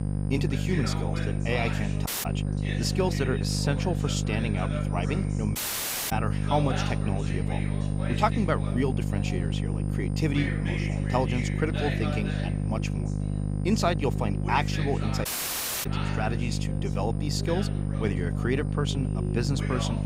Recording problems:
electrical hum; loud; throughout; 50 Hz, 7 dB below the speech
background chatter; loud; throughout; 2 voices, 9 dB below the speech
high-pitched whine; faint; throughout; 9 kHz, 25 dB below the speech
audio cutting out; at 2 s, at 5.5 s for 0.5 s and at 15 s for 0.5 s

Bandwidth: 15.5 kHz